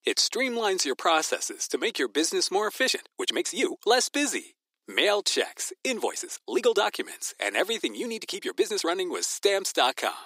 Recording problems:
thin; very; fading below 300 Hz
uneven, jittery; strongly; from 3 to 9 s

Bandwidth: 15.5 kHz